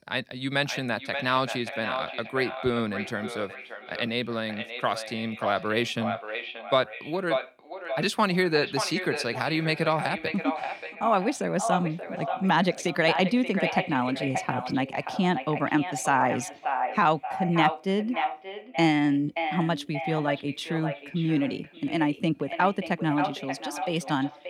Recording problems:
echo of what is said; strong; throughout; 580 ms later, 7 dB below the speech

